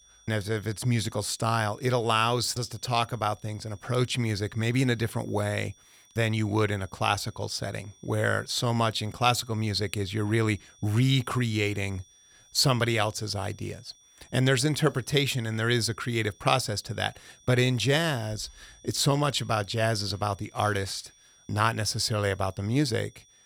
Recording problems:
high-pitched whine; faint; throughout; 5.5 kHz, 30 dB below the speech

